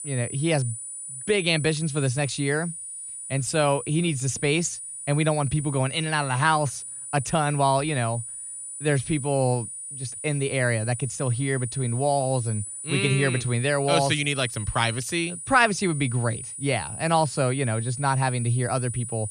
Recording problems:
high-pitched whine; loud; throughout; 9.5 kHz, 9 dB below the speech

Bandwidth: 13.5 kHz